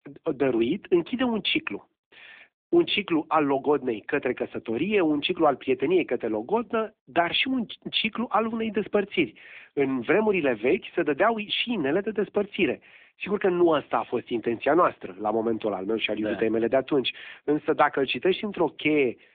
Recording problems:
phone-call audio

